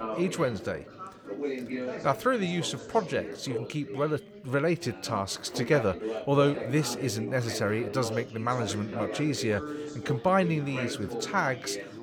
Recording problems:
background chatter; loud; throughout; 4 voices, 8 dB below the speech

